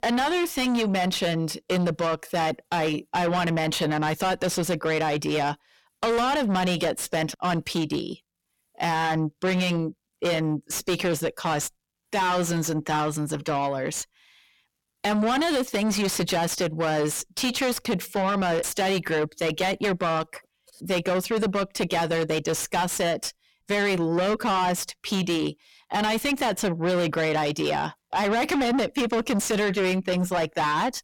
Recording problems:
distortion; heavy; 6 dB below the speech

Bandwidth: 17 kHz